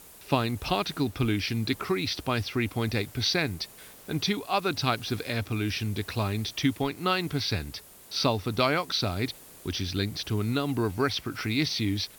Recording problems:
high frequencies cut off; noticeable; nothing above 6 kHz
hiss; noticeable; throughout; 20 dB below the speech

